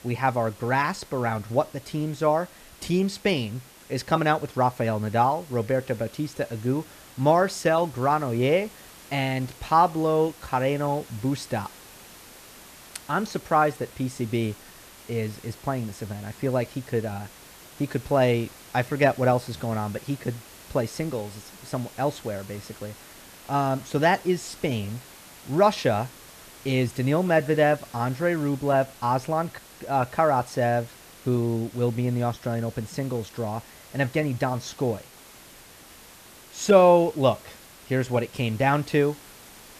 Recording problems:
hiss; faint; throughout; 20 dB below the speech

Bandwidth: 14.5 kHz